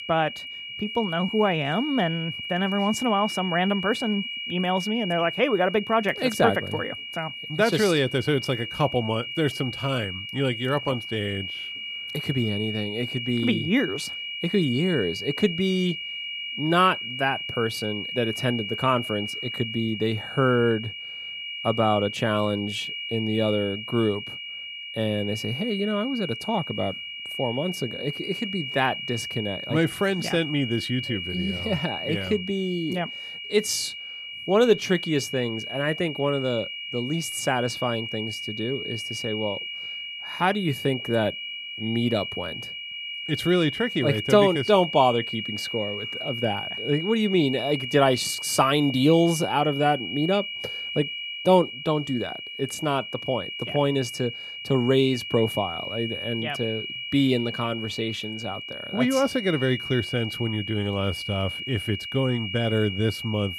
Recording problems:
high-pitched whine; loud; throughout; 3 kHz, 6 dB below the speech

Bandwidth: 14 kHz